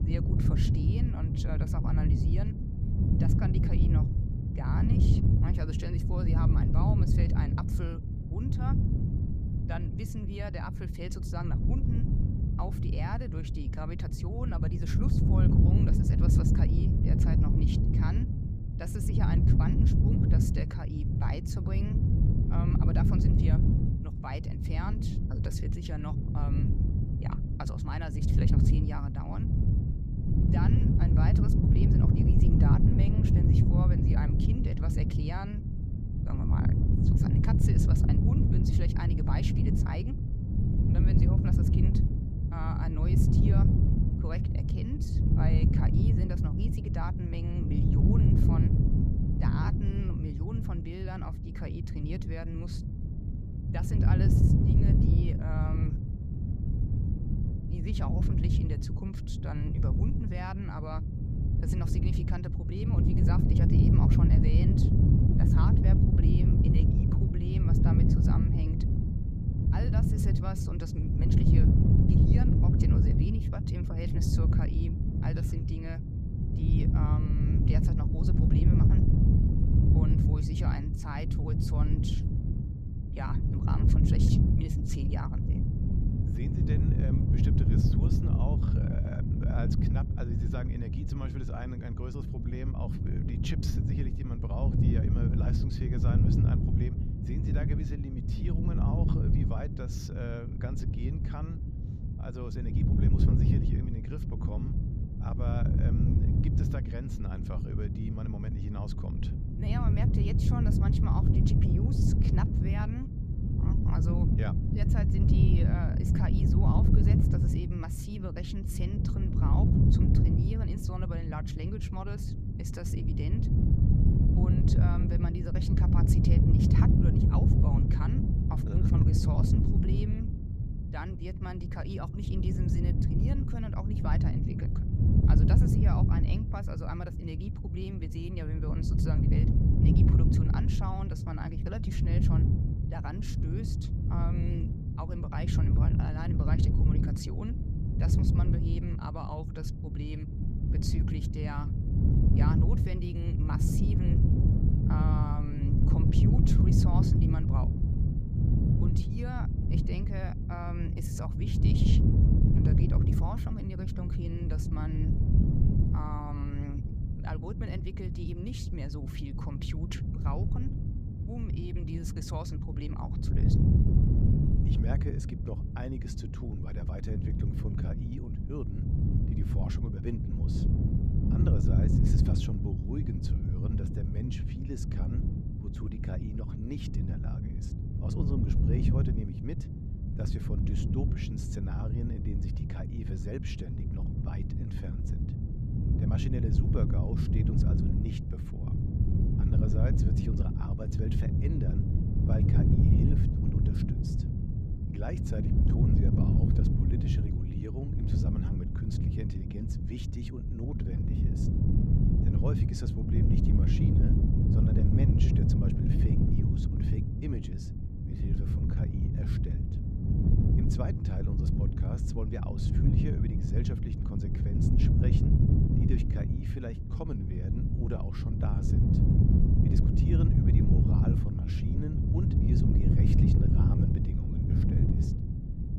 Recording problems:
wind noise on the microphone; heavy; 4 dB above the speech

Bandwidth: 15 kHz